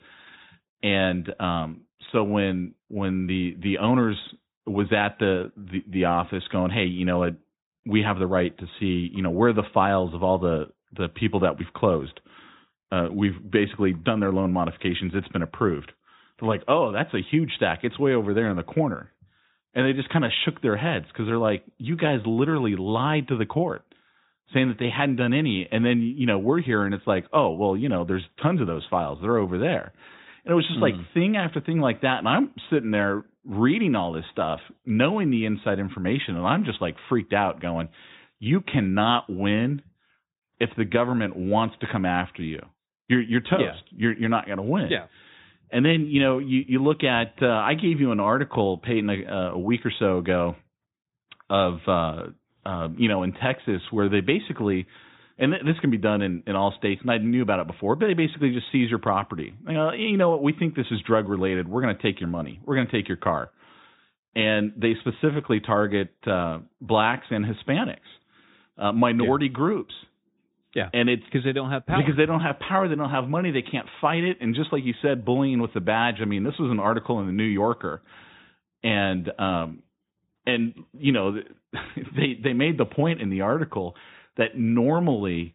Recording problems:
high frequencies cut off; severe; nothing above 4 kHz

